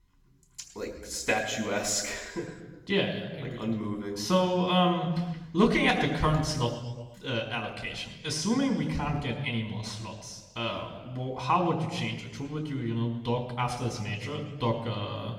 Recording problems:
off-mic speech; far
room echo; noticeable; dies away in 1.2 s

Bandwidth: 17 kHz